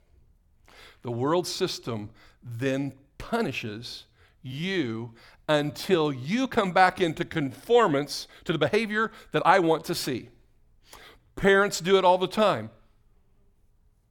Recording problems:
uneven, jittery; strongly; from 1.5 to 12 s

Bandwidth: 18 kHz